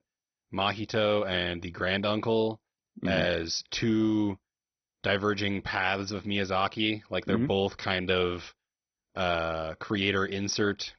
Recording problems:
garbled, watery; badly; nothing above 6 kHz

